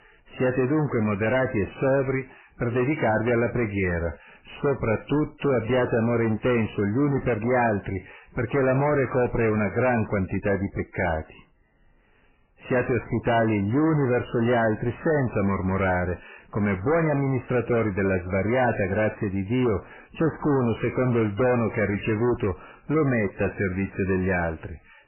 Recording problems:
distortion; heavy; 6 dB below the speech
garbled, watery; badly; nothing above 3 kHz

